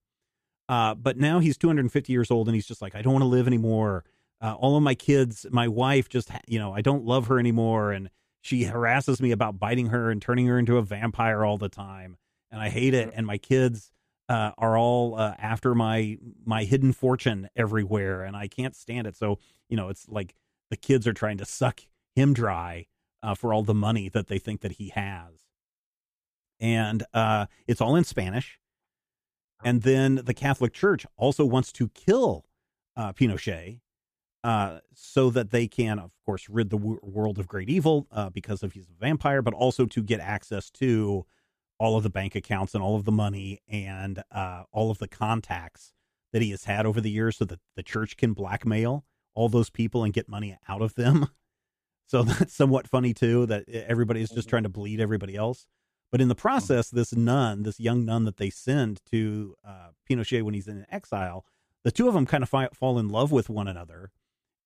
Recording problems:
none

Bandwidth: 14.5 kHz